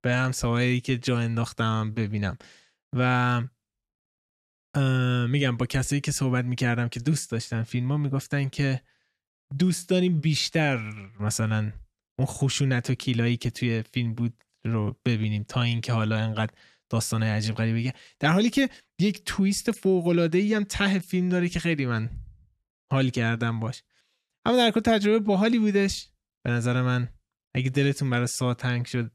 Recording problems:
none

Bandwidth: 13.5 kHz